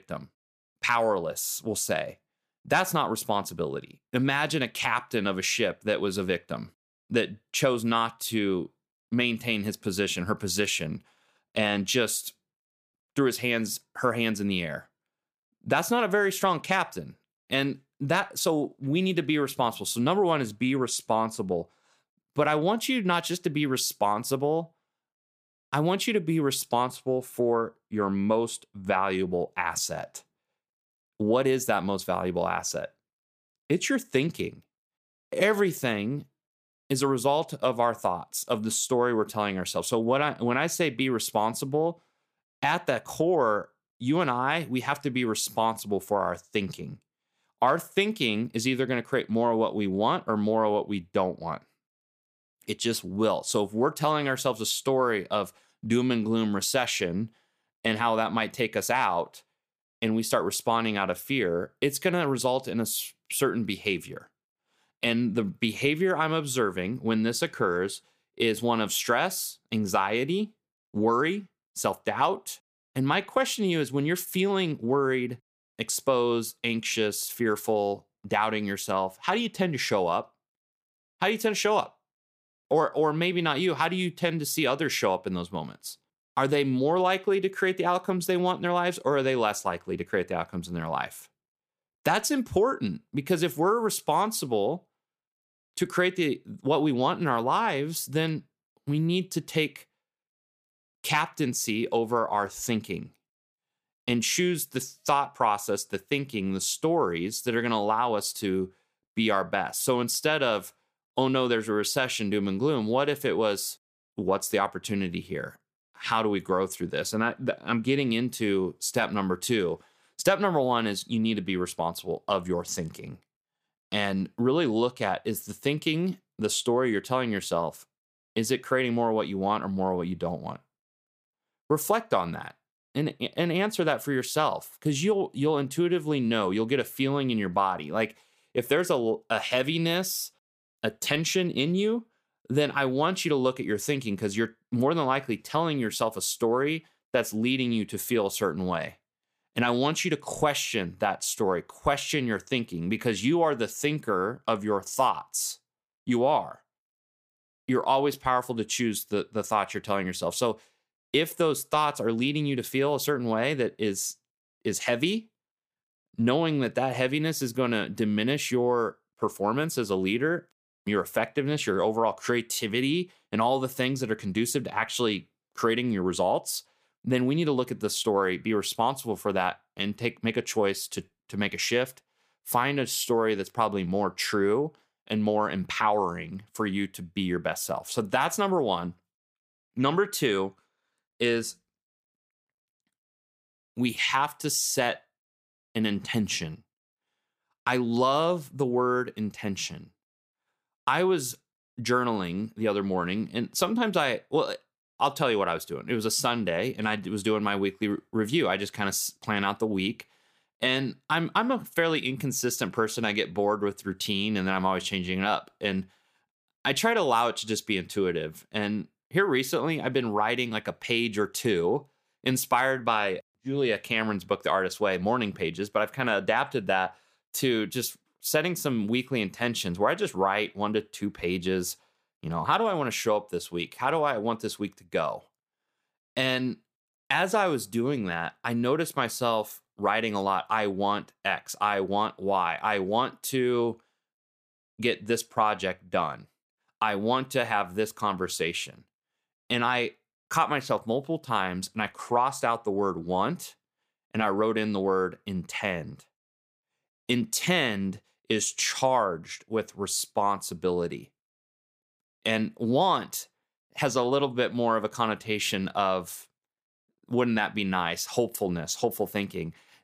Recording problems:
none

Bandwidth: 15 kHz